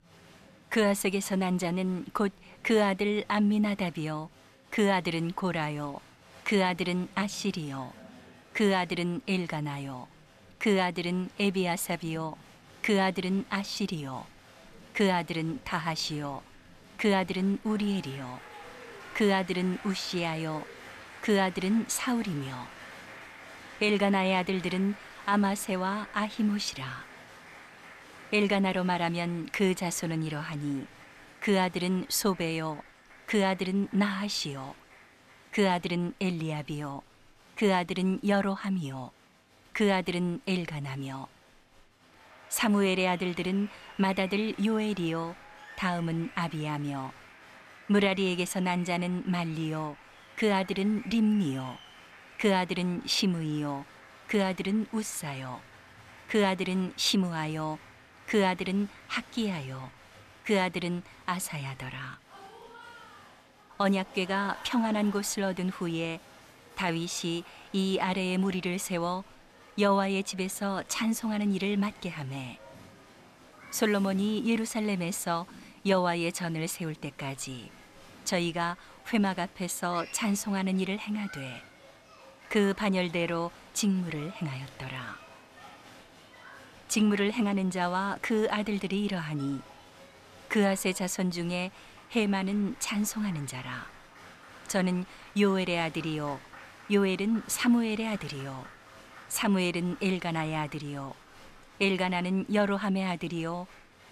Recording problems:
crowd noise; faint; throughout; 20 dB below the speech

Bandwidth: 14 kHz